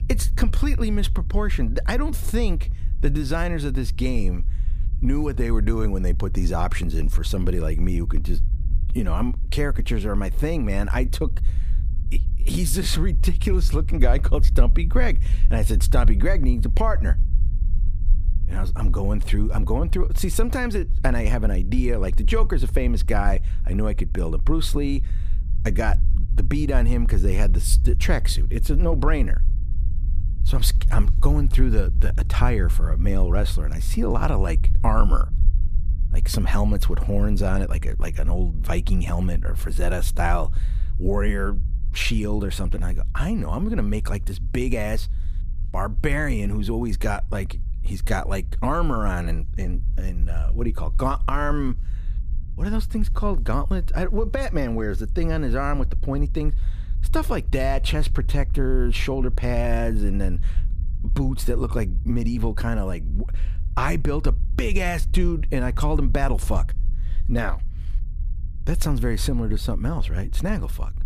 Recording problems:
low rumble; noticeable; throughout; 20 dB below the speech

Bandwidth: 15 kHz